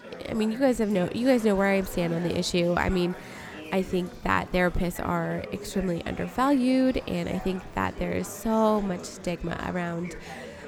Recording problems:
chatter from many people; noticeable; throughout; 15 dB below the speech

